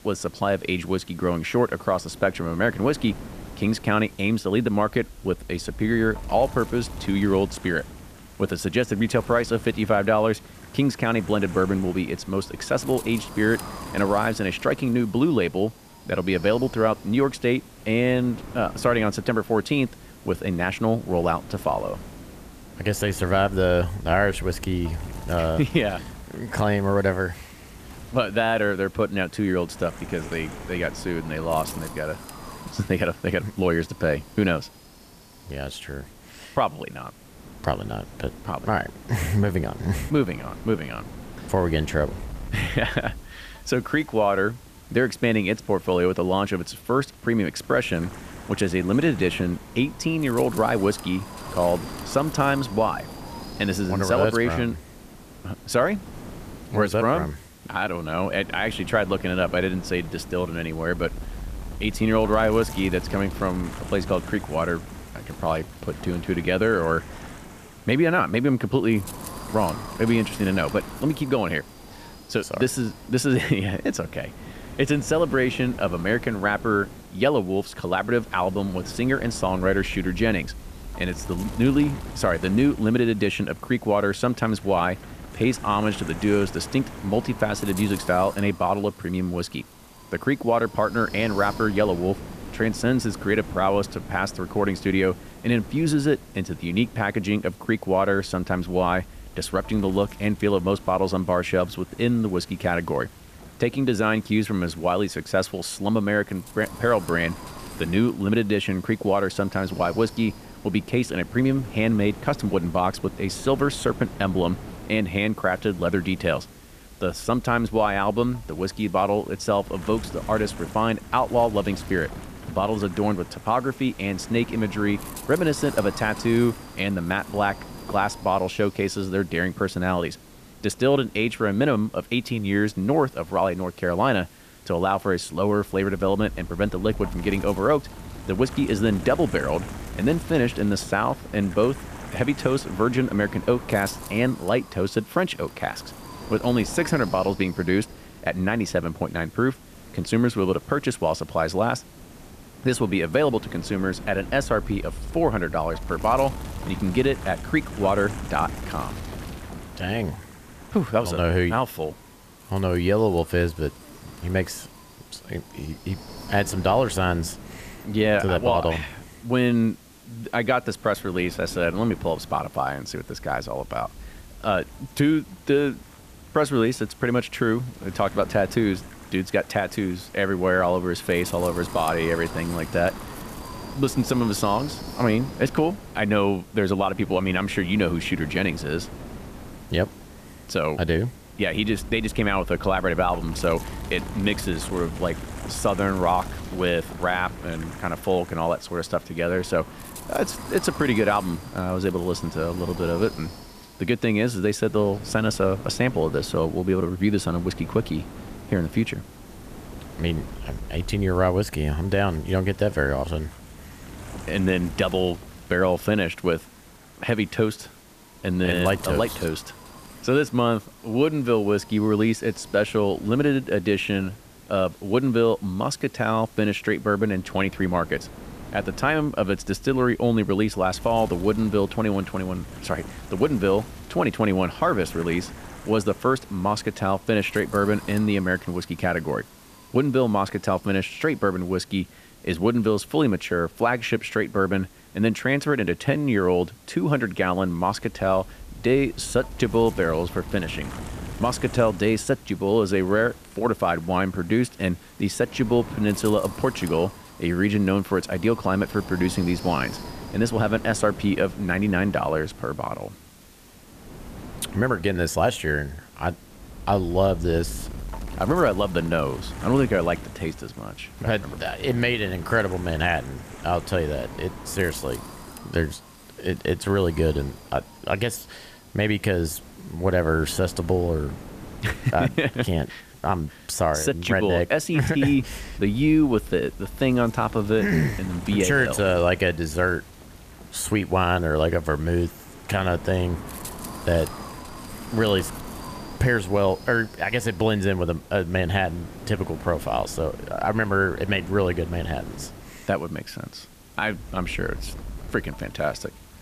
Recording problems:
wind noise on the microphone; occasional gusts; 20 dB below the speech
hiss; faint; throughout; 25 dB below the speech

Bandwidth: 14.5 kHz